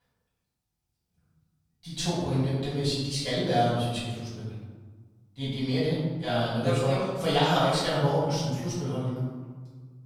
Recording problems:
room echo; strong; dies away in 1.3 s
off-mic speech; far

